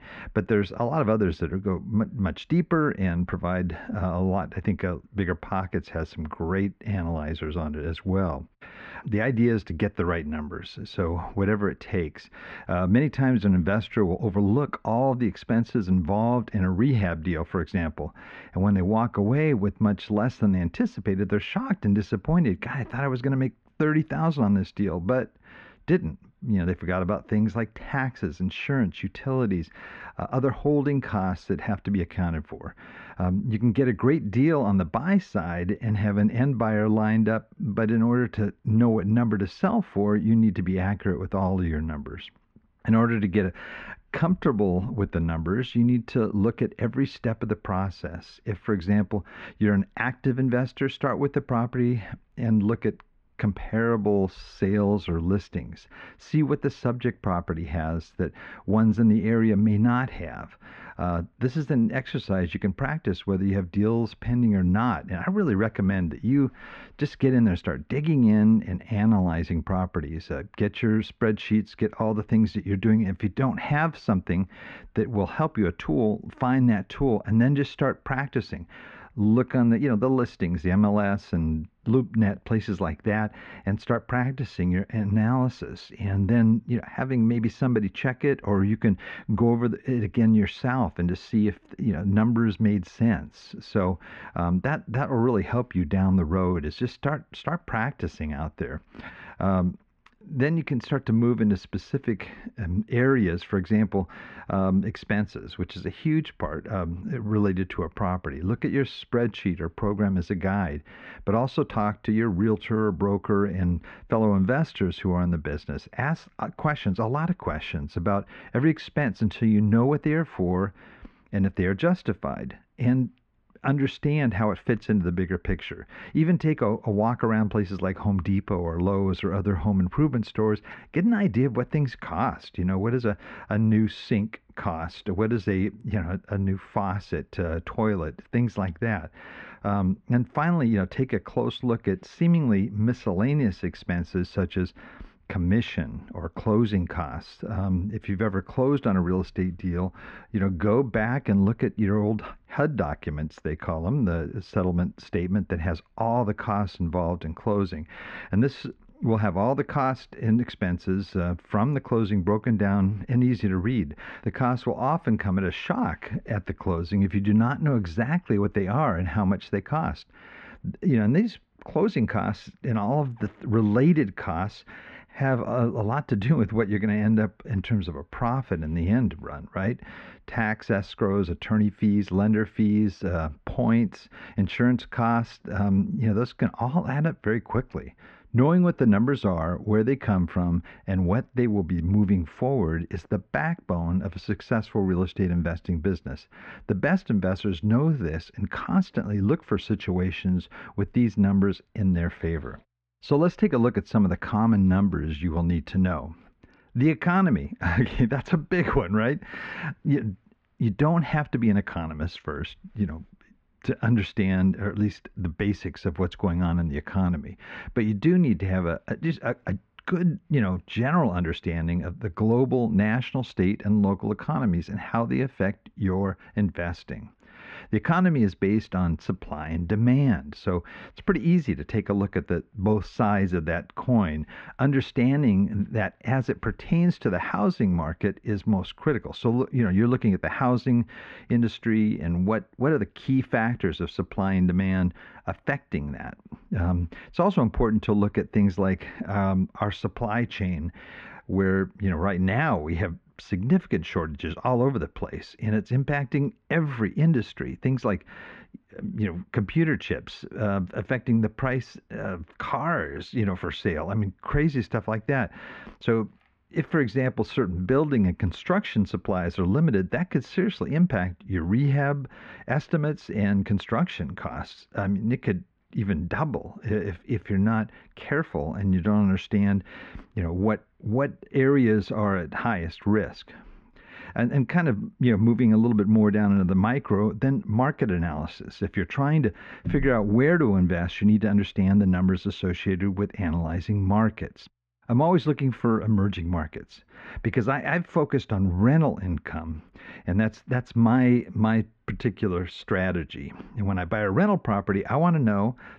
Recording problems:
muffled; very; fading above 2 kHz

